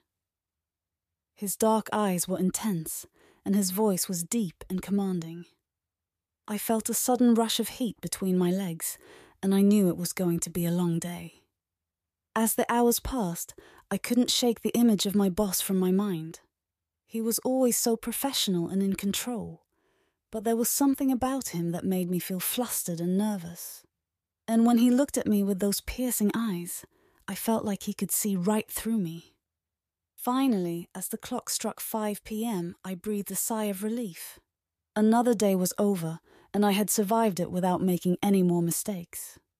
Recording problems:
none

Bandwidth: 14.5 kHz